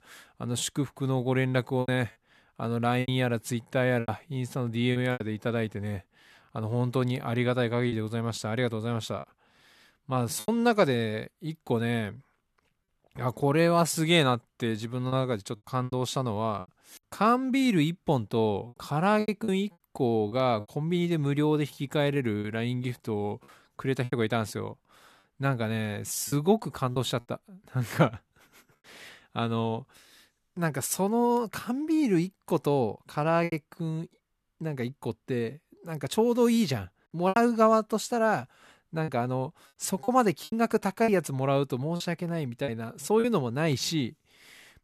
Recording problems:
choppy; occasionally; 5% of the speech affected

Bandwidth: 13.5 kHz